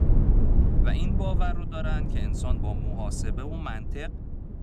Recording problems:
low rumble; loud; throughout; 3 dB below the speech

